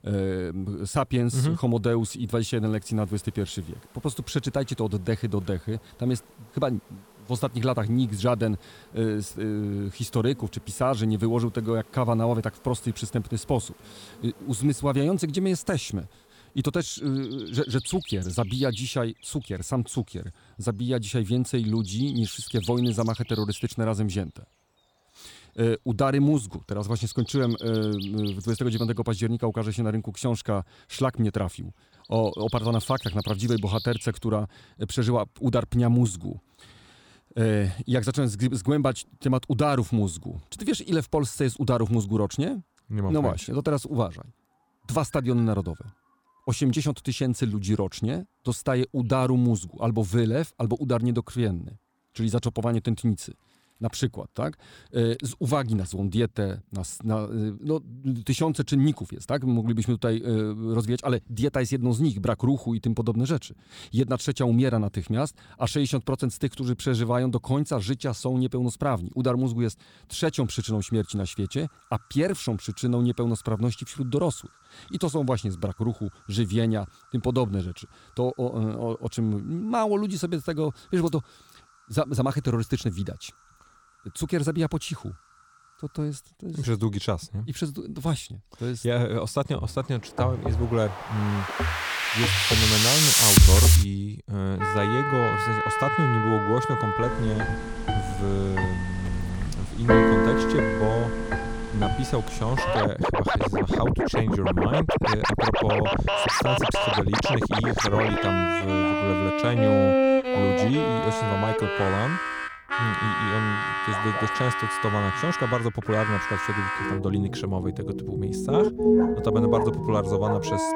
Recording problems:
background music; very loud; from 1:30 on; 3 dB above the speech
animal sounds; noticeable; throughout; 20 dB below the speech

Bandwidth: 18.5 kHz